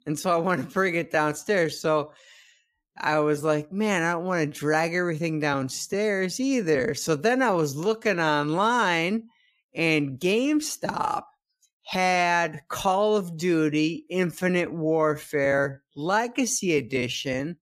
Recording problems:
wrong speed, natural pitch; too slow; 0.6 times normal speed

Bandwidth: 14.5 kHz